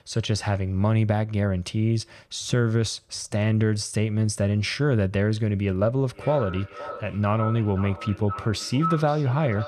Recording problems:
echo of what is said; strong; from 6 s on; 520 ms later, 10 dB below the speech

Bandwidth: 14.5 kHz